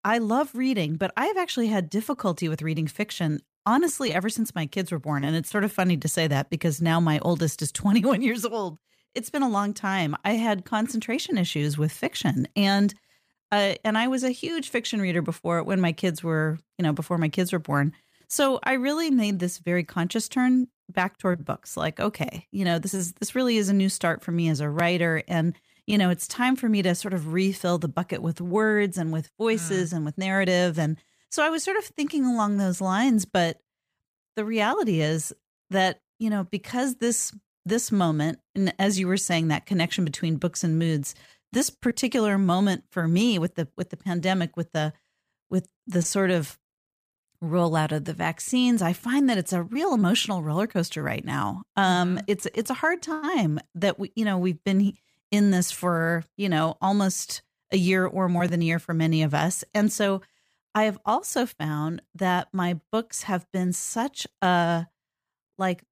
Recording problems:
none

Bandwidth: 15 kHz